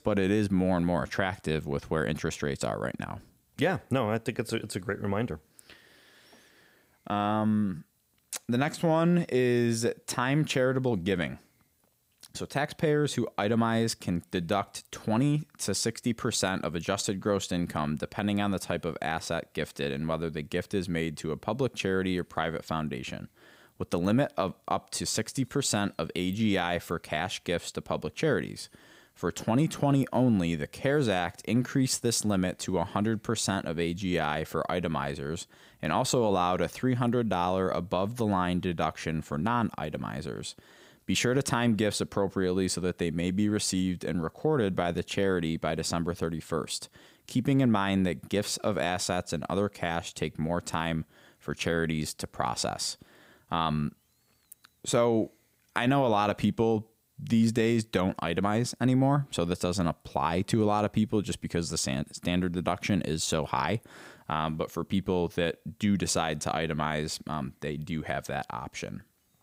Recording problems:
none

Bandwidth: 15.5 kHz